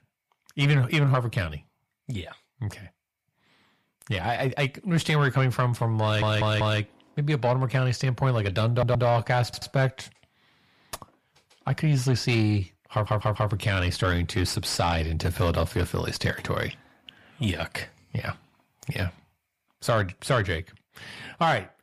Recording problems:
distortion; slight; 10 dB below the speech
audio stuttering; 4 times, first at 6 s

